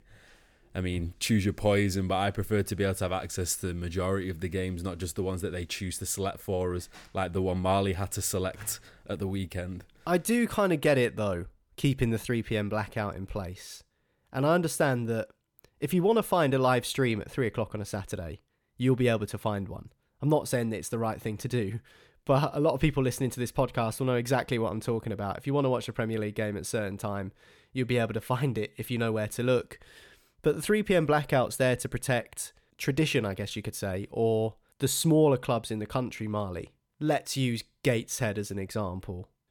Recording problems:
none

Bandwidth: 18 kHz